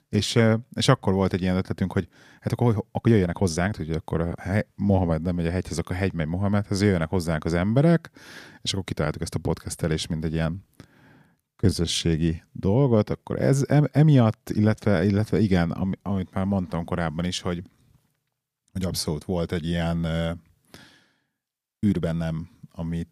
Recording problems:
uneven, jittery; strongly; from 2.5 to 22 s

